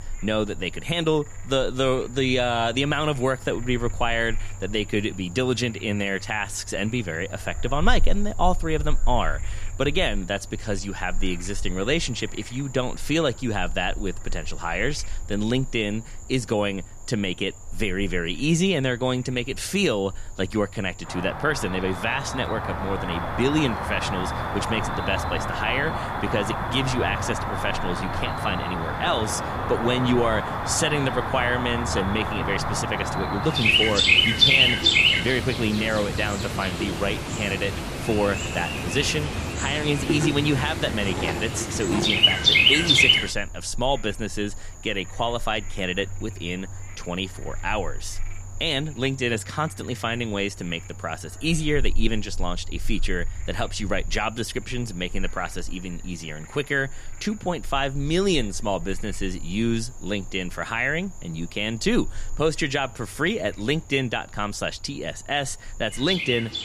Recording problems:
animal sounds; very loud; throughout; 2 dB above the speech

